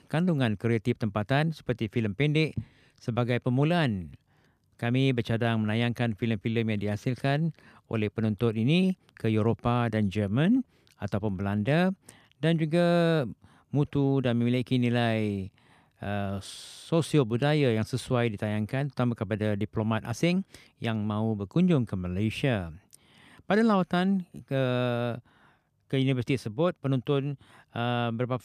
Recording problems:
none

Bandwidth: 14.5 kHz